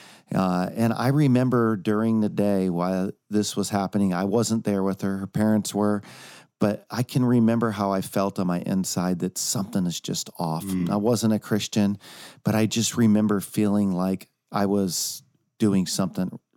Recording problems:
none

